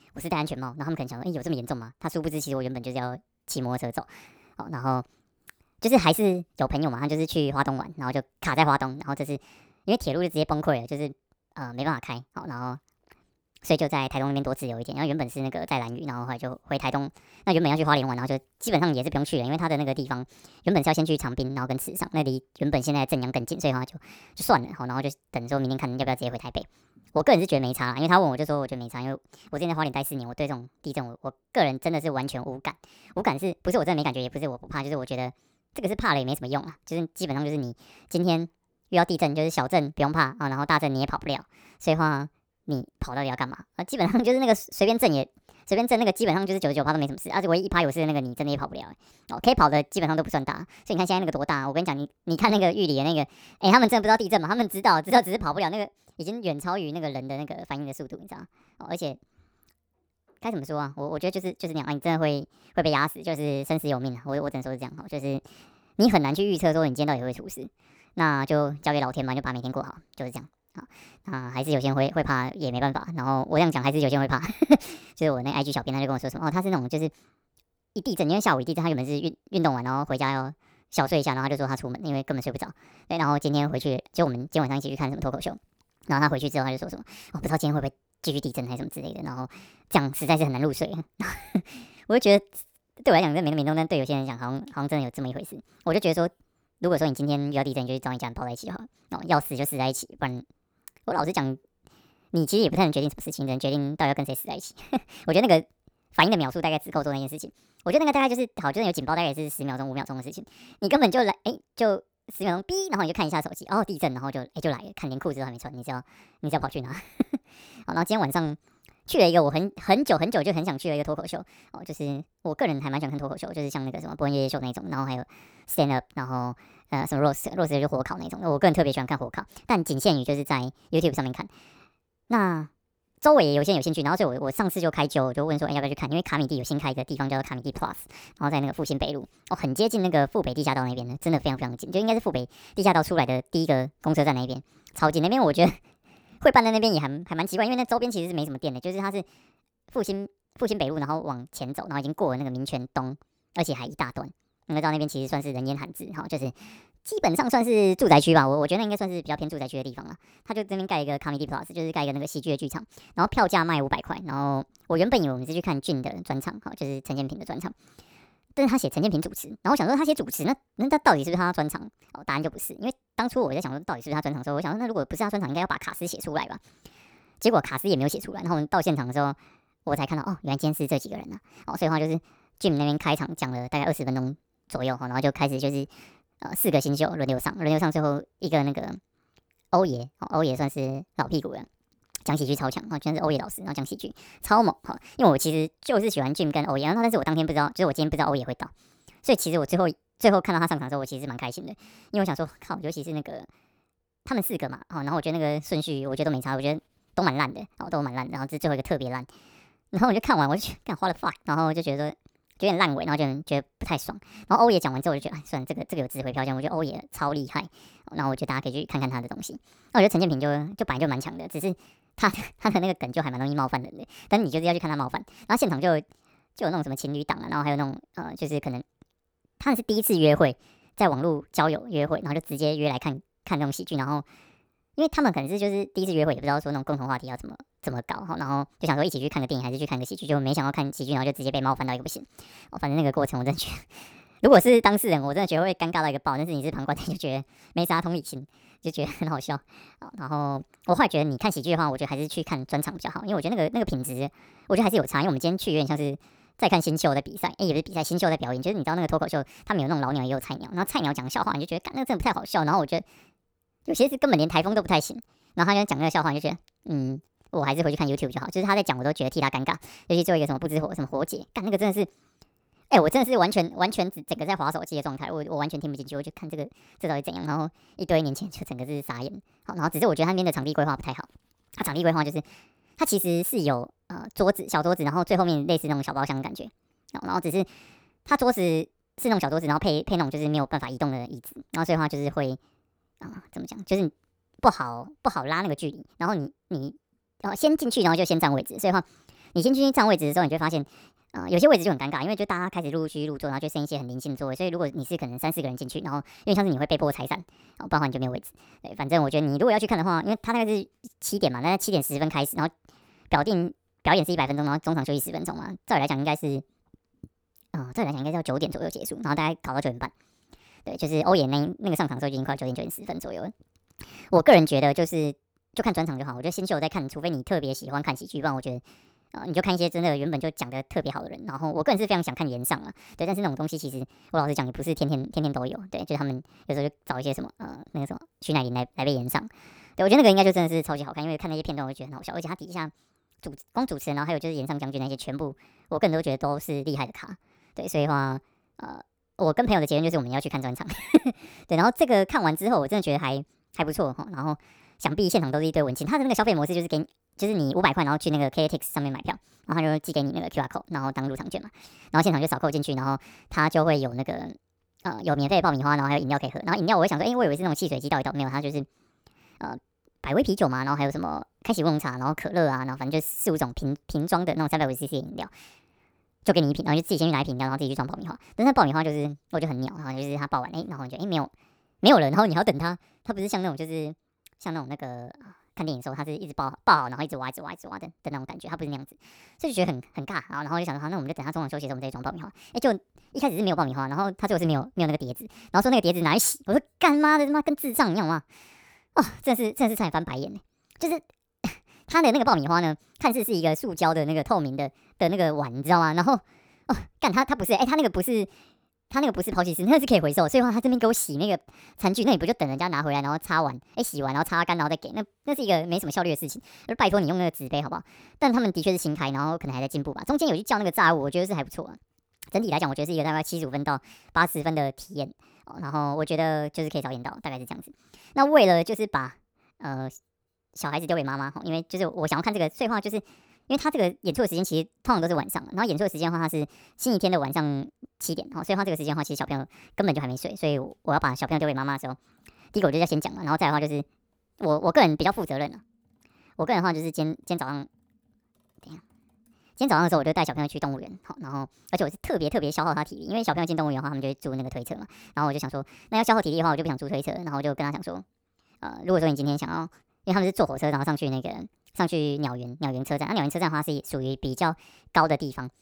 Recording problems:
wrong speed and pitch; too fast and too high; 1.5 times normal speed

